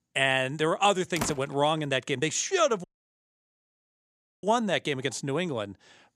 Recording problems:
door banging; noticeable; at 1 s; peak 8 dB below the speech
audio cutting out; at 3 s for 1.5 s

